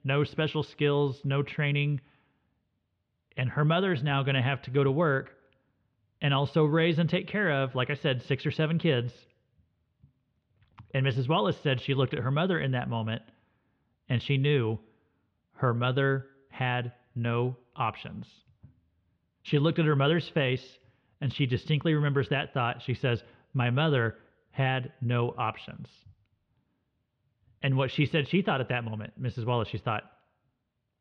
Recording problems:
muffled; slightly; fading above 3.5 kHz

